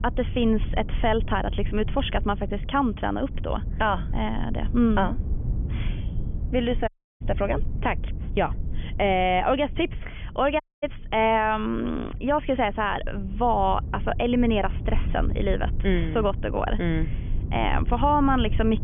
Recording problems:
high frequencies cut off; severe; nothing above 3.5 kHz
low rumble; faint; throughout; 20 dB below the speech
audio cutting out; at 7 s and at 11 s

